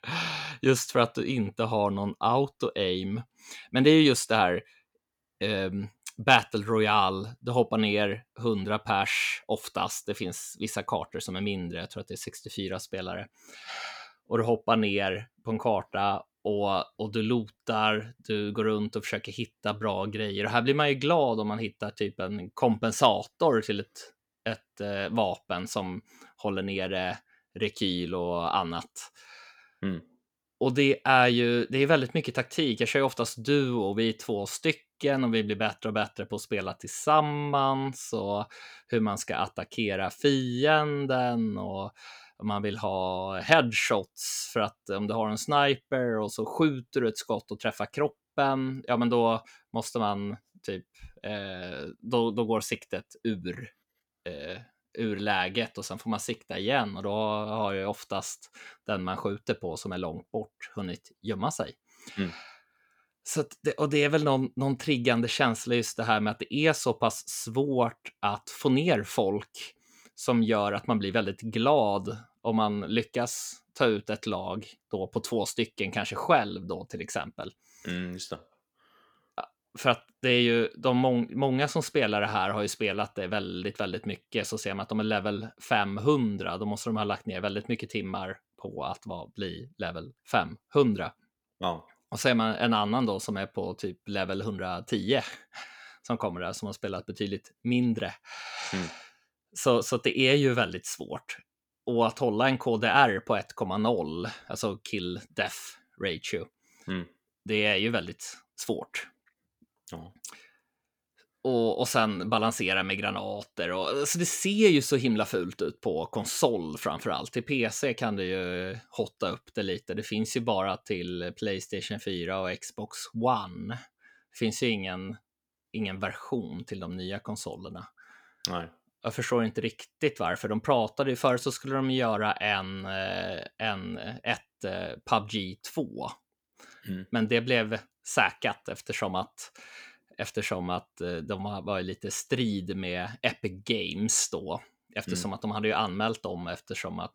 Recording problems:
none

